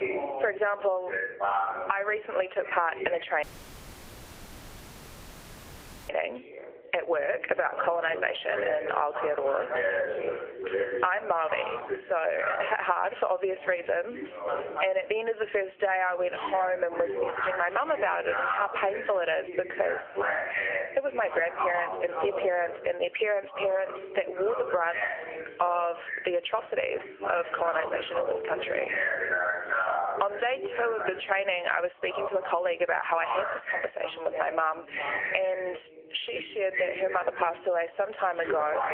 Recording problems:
thin; very; fading below 500 Hz
phone-call audio; nothing above 3 kHz
squashed, flat; somewhat, background pumping
background chatter; loud; throughout; 2 voices, 4 dB below the speech
audio cutting out; at 3.5 s for 2.5 s

